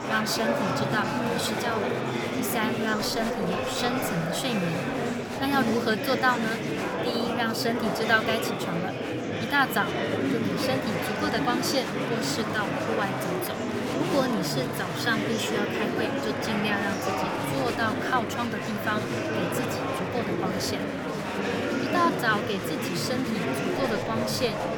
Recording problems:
murmuring crowd; very loud; throughout; as loud as the speech

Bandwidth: 18 kHz